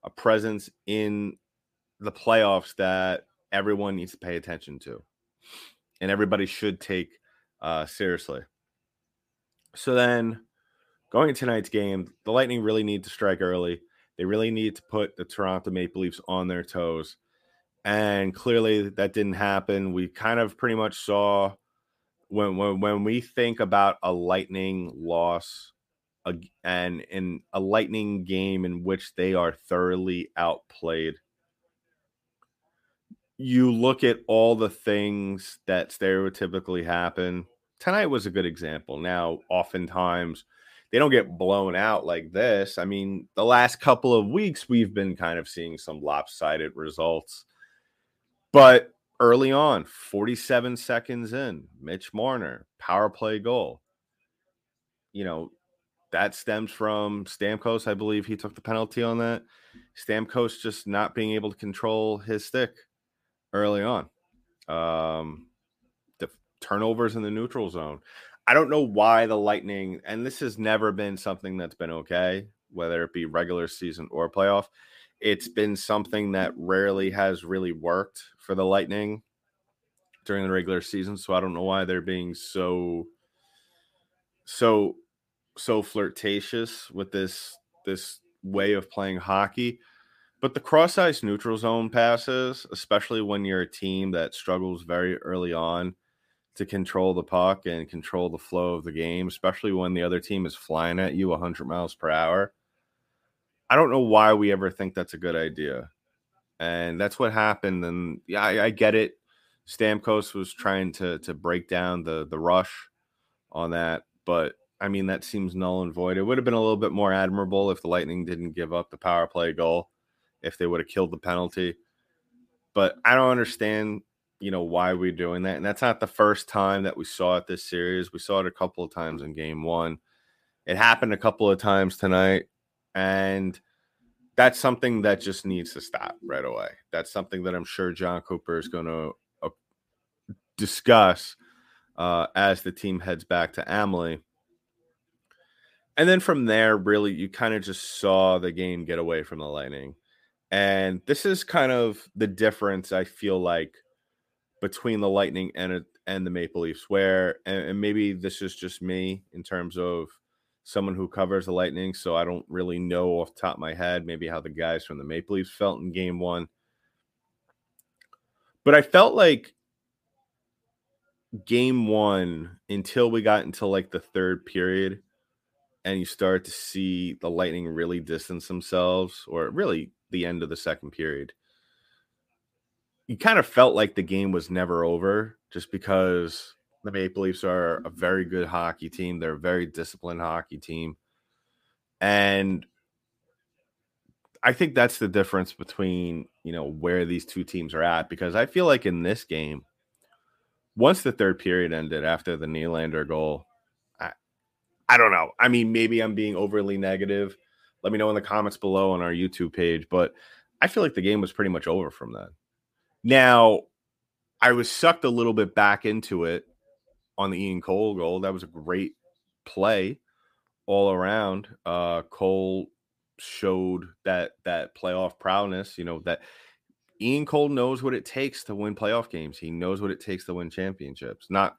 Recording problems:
none

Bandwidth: 15 kHz